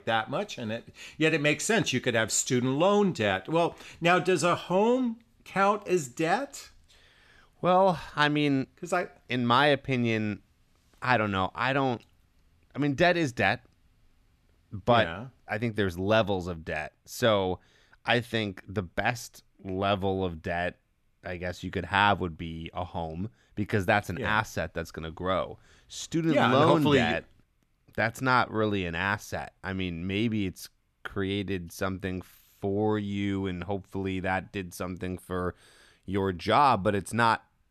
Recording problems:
none

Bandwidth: 14 kHz